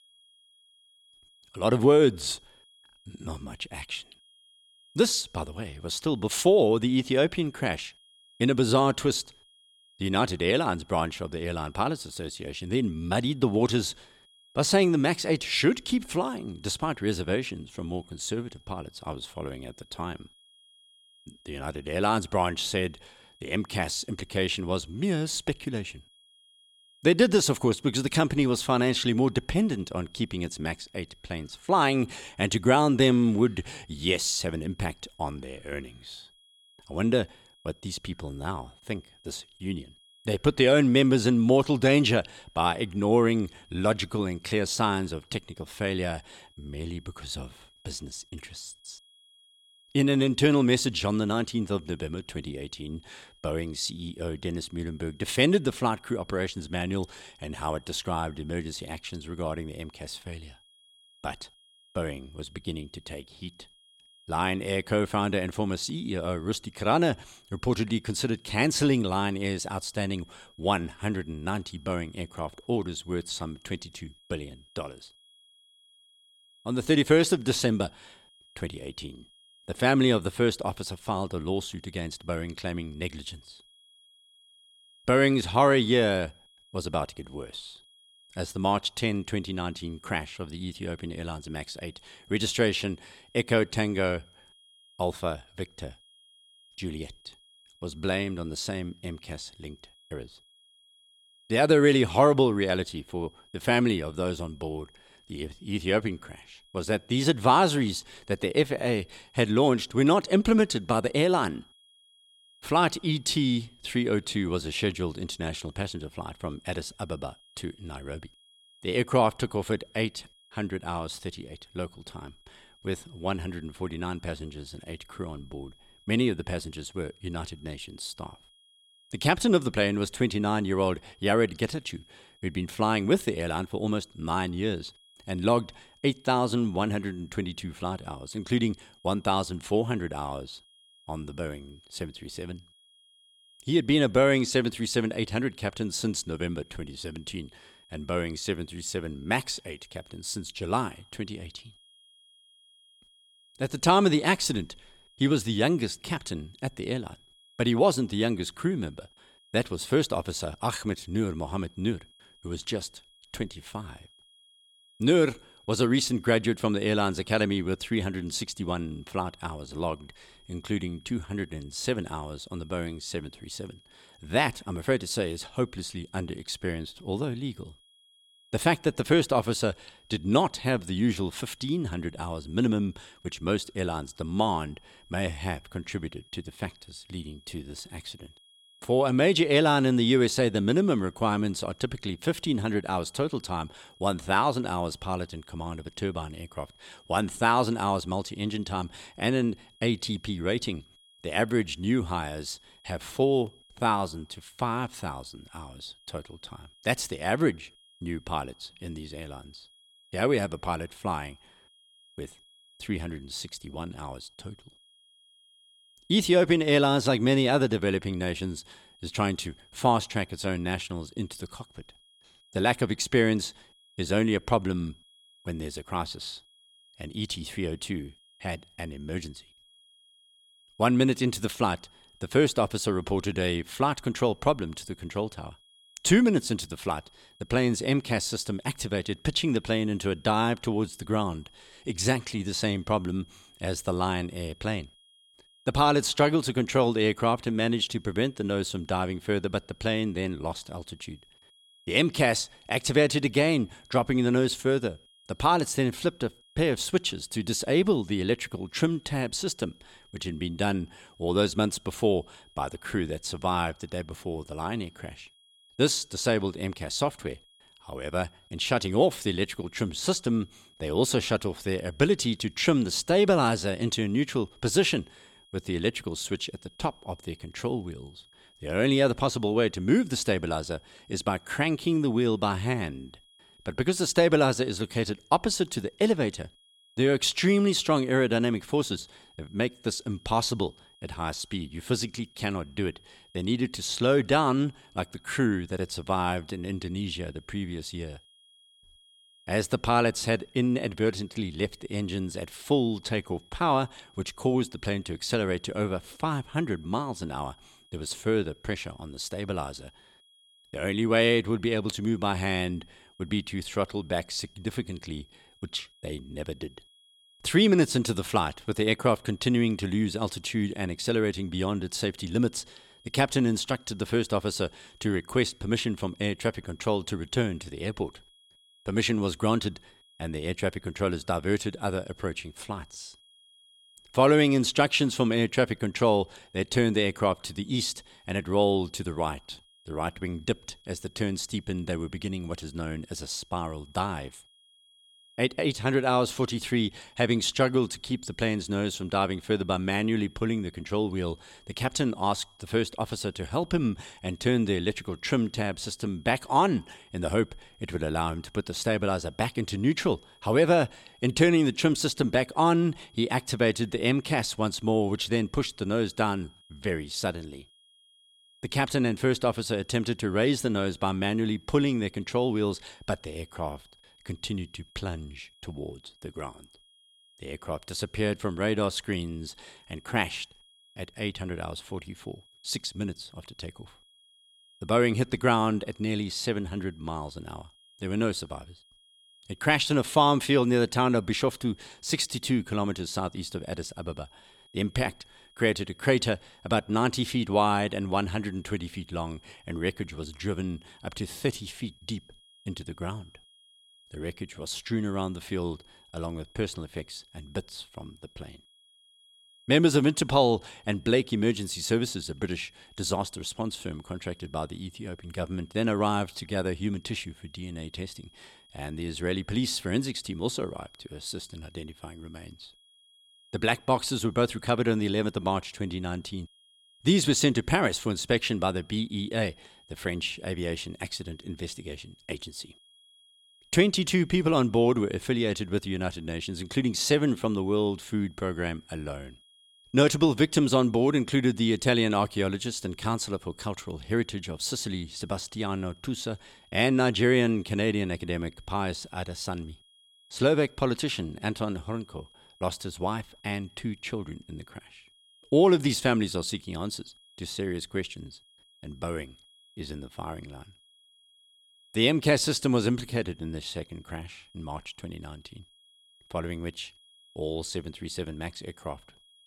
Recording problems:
high-pitched whine; faint; throughout; 3.5 kHz, 30 dB below the speech

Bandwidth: 17 kHz